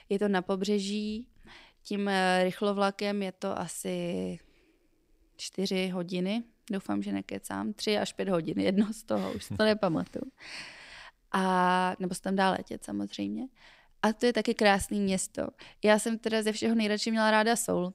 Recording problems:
none

